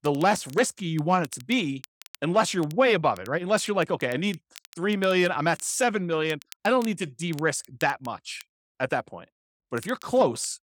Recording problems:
crackle, like an old record; faint; 25 dB below the speech

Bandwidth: 18.5 kHz